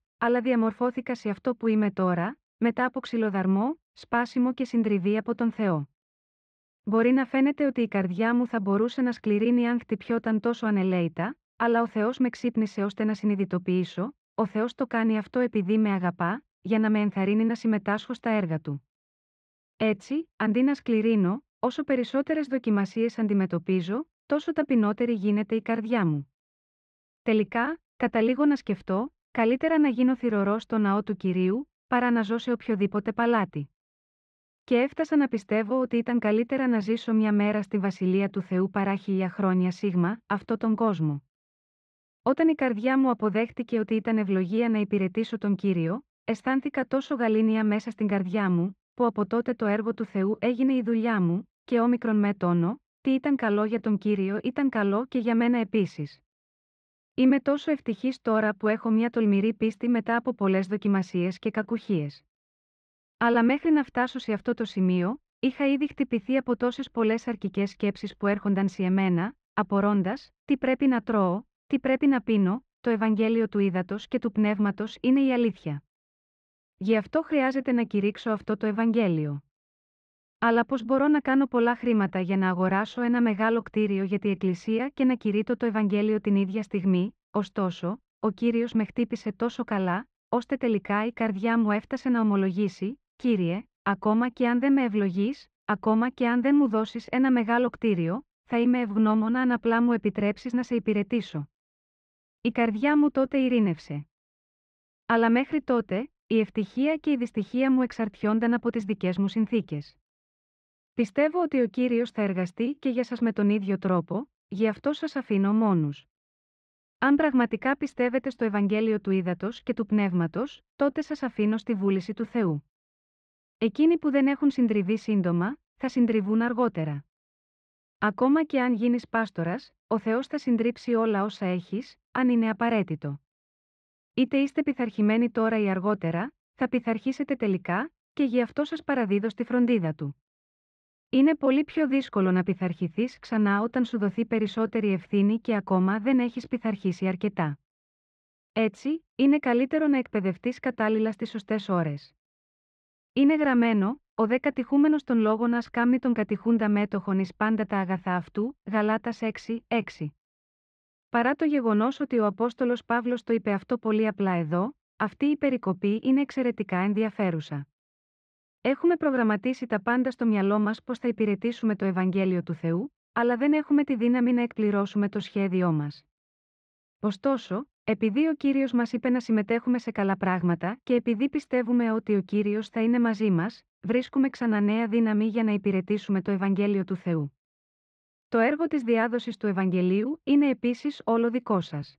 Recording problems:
muffled; very; fading above 3 kHz

